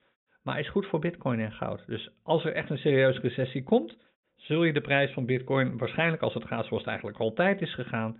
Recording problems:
high frequencies cut off; severe; nothing above 3.5 kHz

